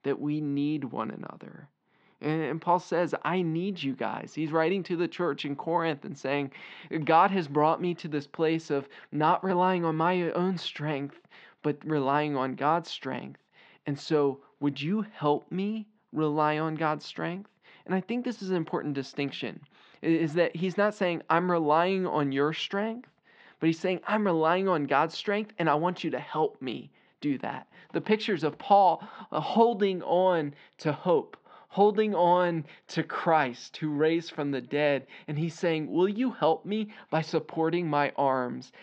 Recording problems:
muffled; slightly; fading above 4 kHz

